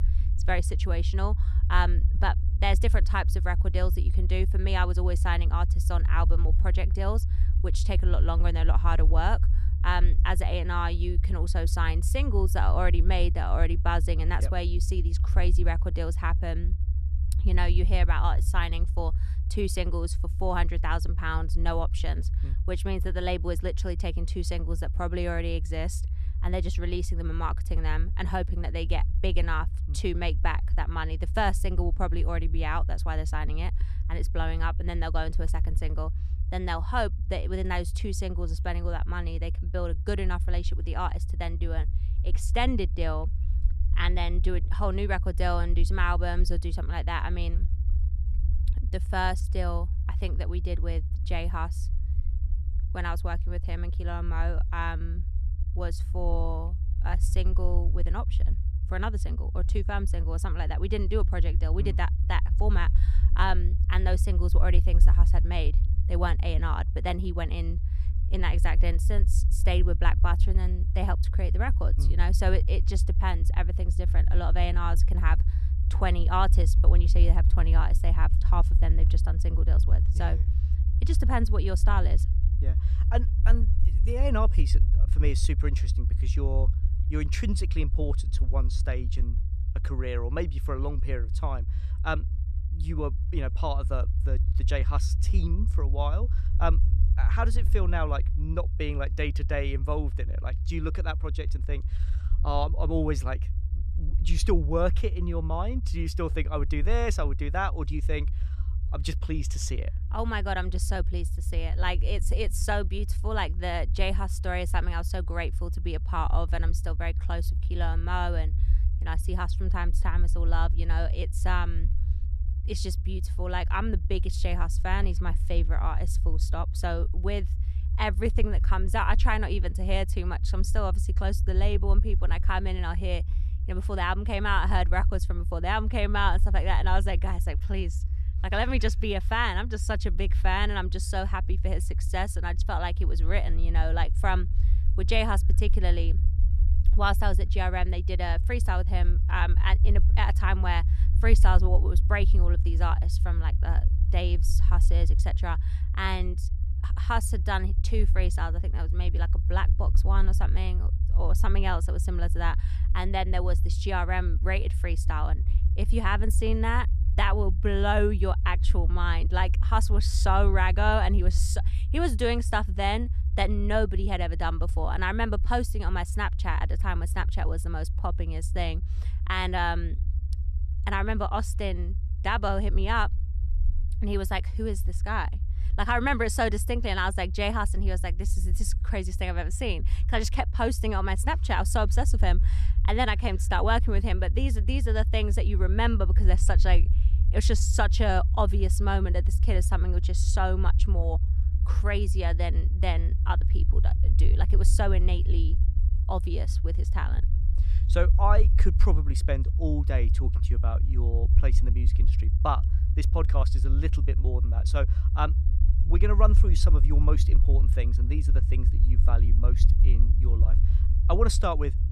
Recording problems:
low rumble; noticeable; throughout; 15 dB below the speech

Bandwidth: 13.5 kHz